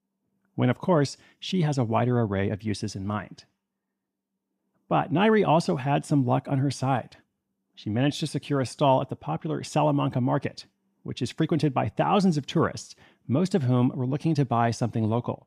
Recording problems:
none

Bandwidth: 14.5 kHz